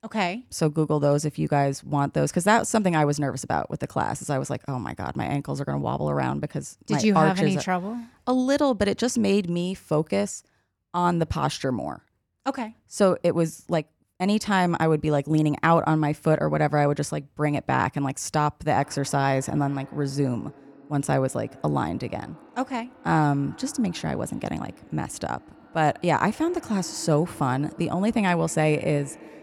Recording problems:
echo of what is said; faint; from 19 s on; 140 ms later, 20 dB below the speech

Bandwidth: 18 kHz